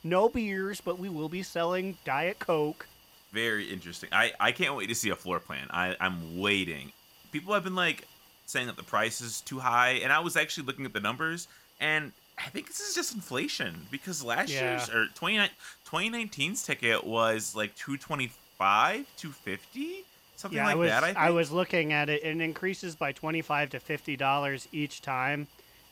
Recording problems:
hiss; faint; throughout; 25 dB below the speech

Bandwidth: 16.5 kHz